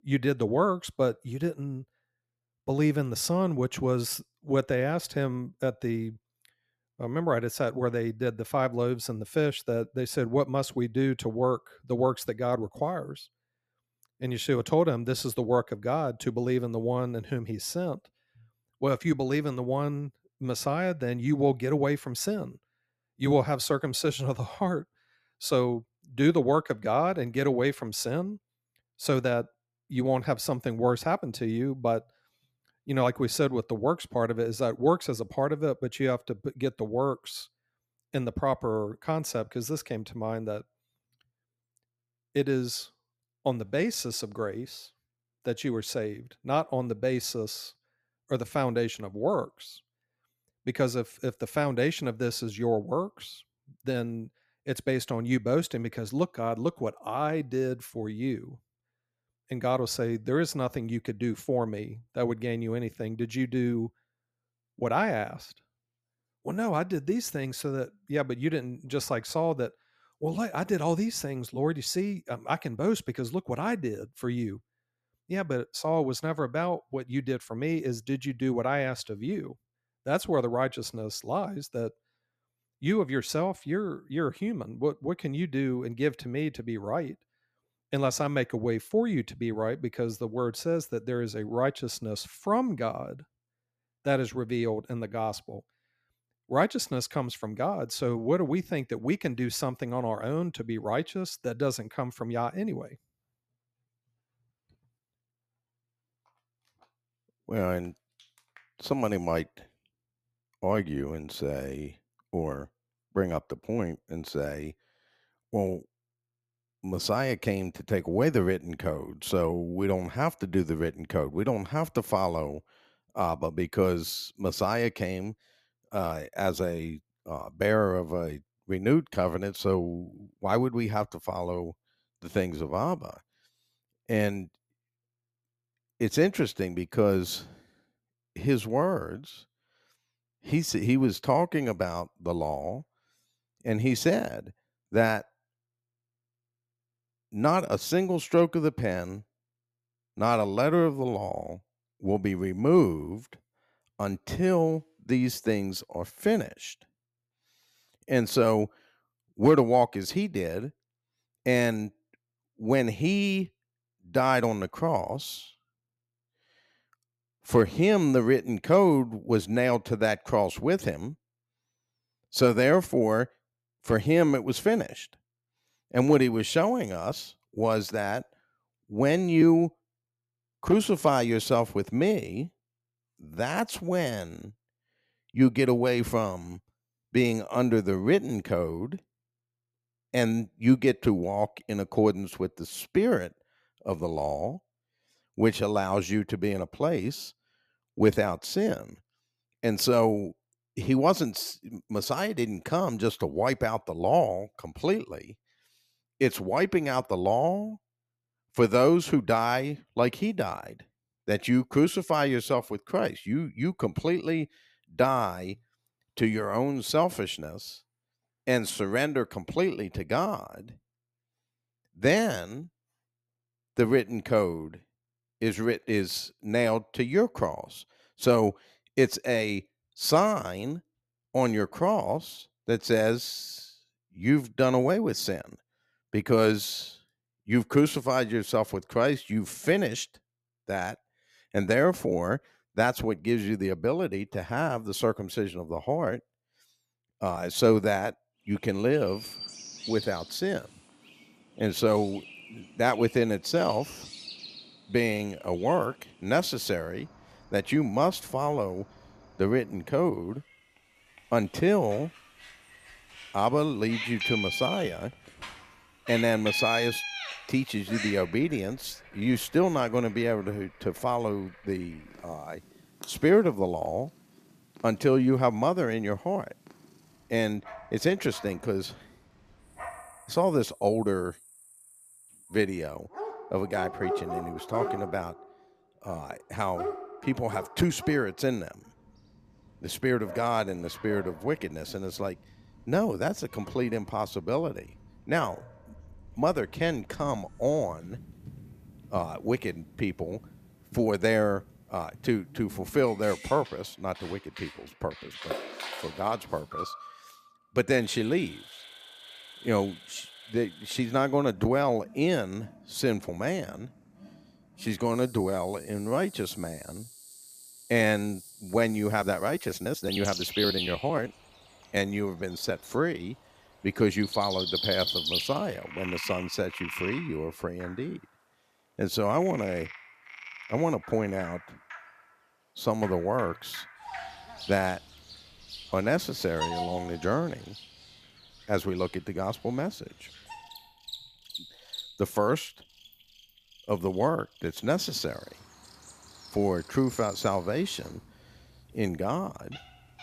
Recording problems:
animal sounds; noticeable; from 4:09 on; 10 dB below the speech

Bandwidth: 14.5 kHz